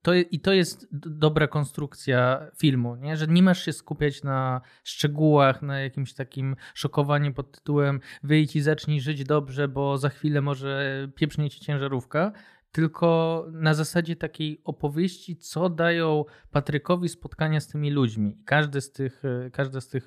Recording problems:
none

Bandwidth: 14.5 kHz